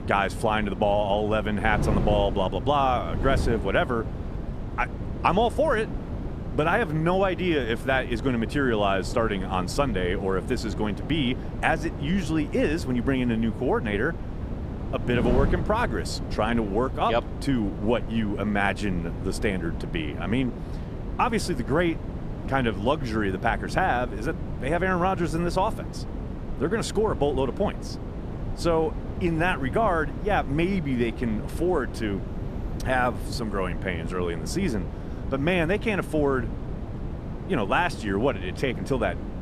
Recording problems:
wind noise on the microphone; occasional gusts; 15 dB below the speech

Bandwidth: 14 kHz